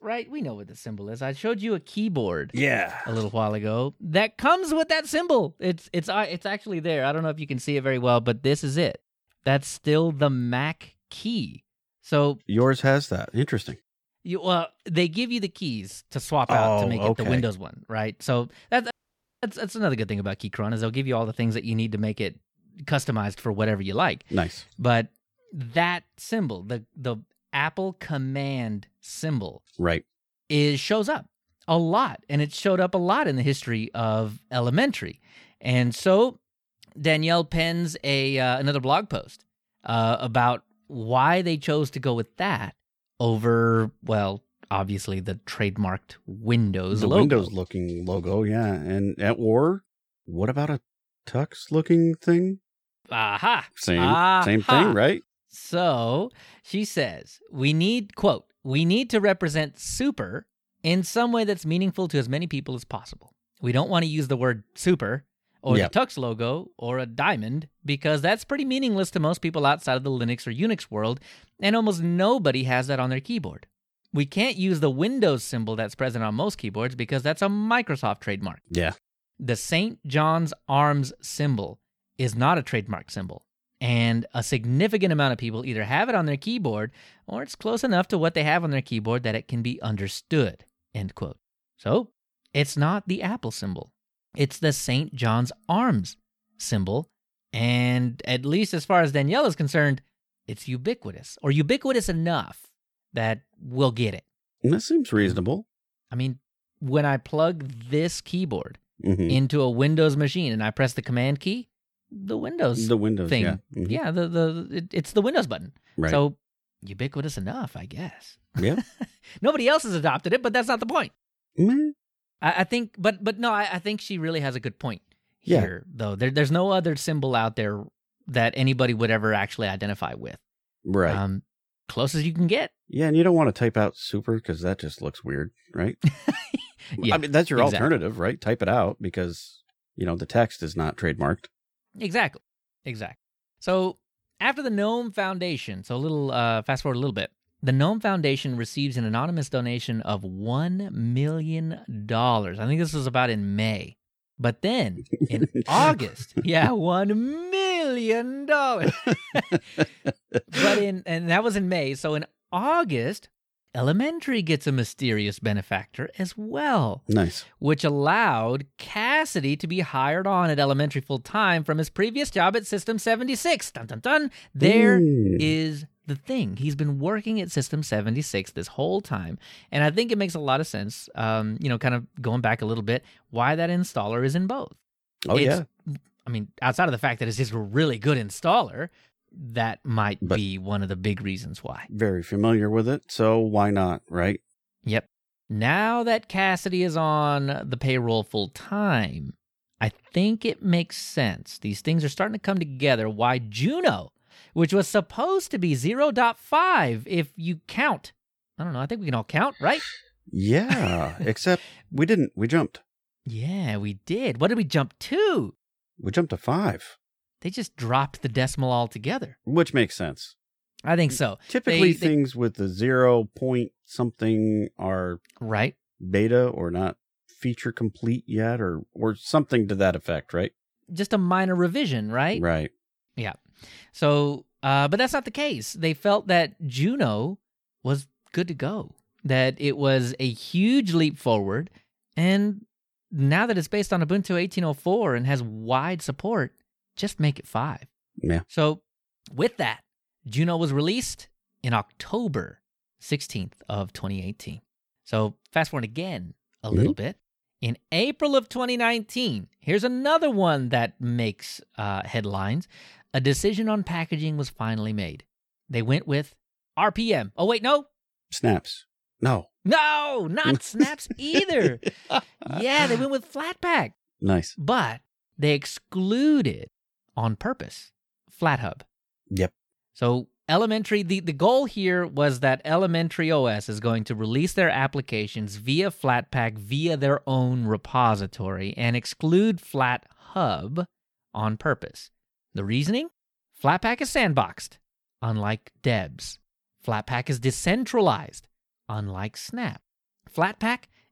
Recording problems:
audio cutting out; at 19 s for 0.5 s

